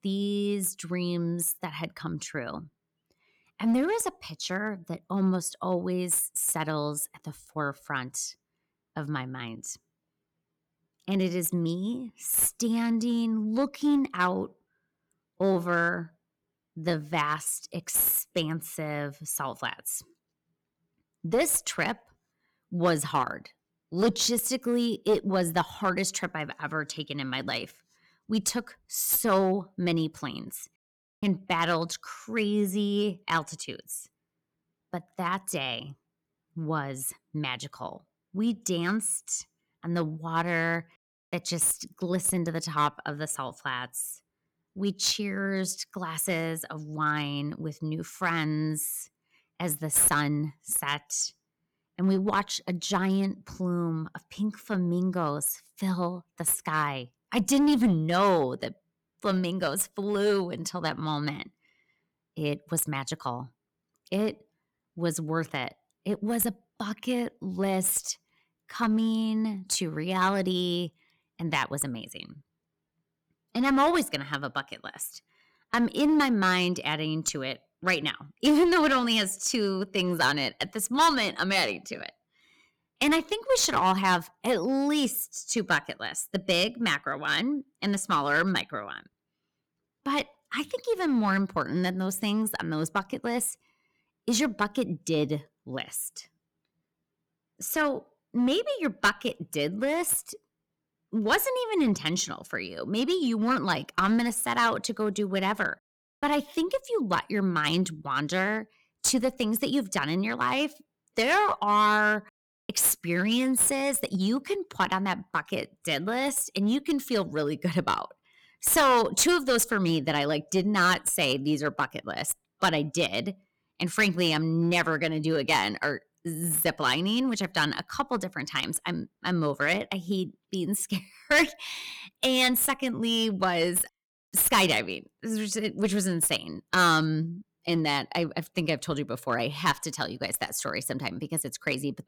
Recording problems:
distortion; slight; 3% of the sound clipped

